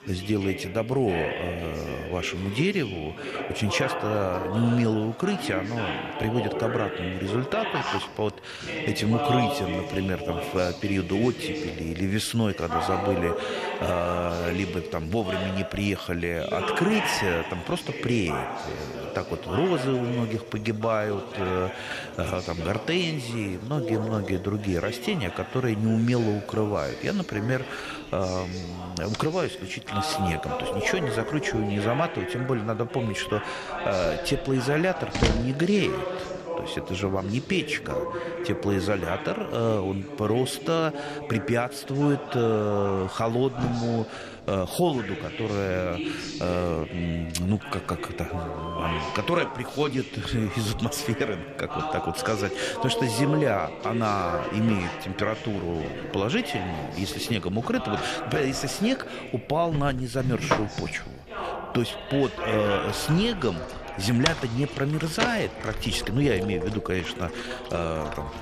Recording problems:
household noises; loud; throughout; 9 dB below the speech
background chatter; loud; throughout; 4 voices, 6 dB below the speech
animal sounds; noticeable; throughout; 20 dB below the speech

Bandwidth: 14 kHz